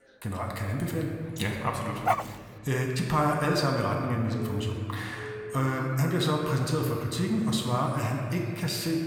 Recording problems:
room echo; noticeable; dies away in 1.8 s
off-mic speech; somewhat distant
chatter from many people; faint; throughout; 30 dB below the speech
background music; very faint; throughout; 25 dB below the speech
dog barking; loud; at 2 s; peak 1 dB above the speech
siren; faint; from 4.5 to 6 s; peak 10 dB below the speech

